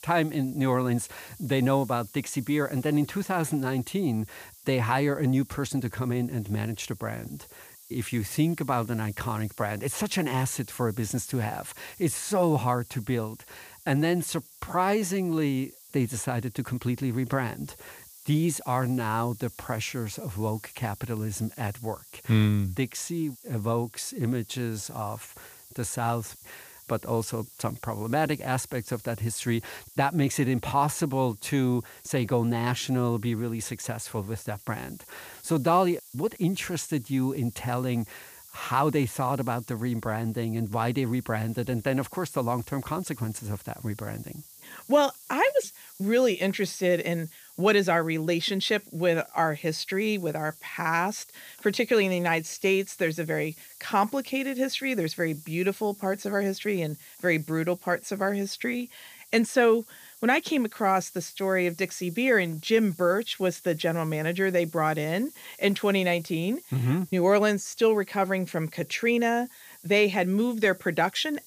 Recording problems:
hiss; faint; throughout; 20 dB below the speech

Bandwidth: 15 kHz